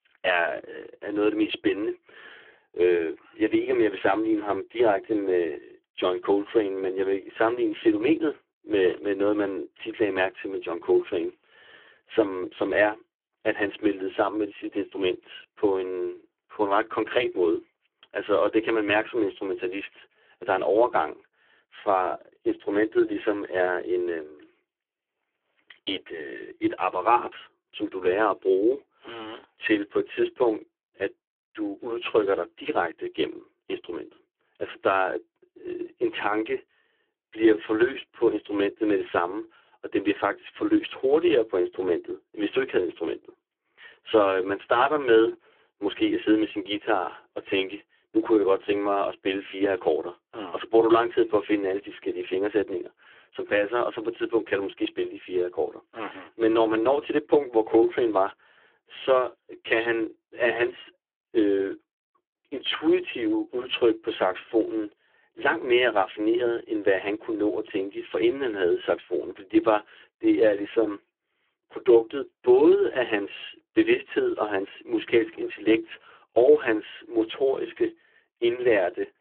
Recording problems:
phone-call audio; poor line

